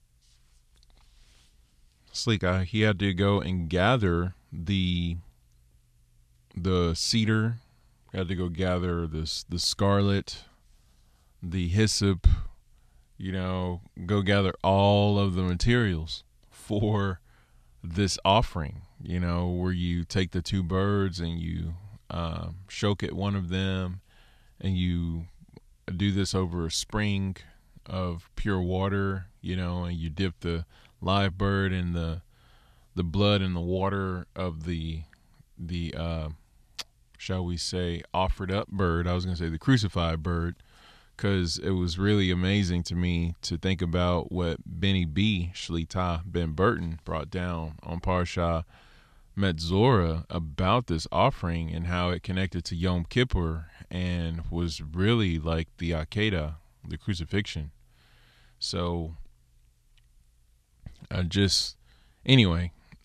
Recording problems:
none

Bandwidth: 13.5 kHz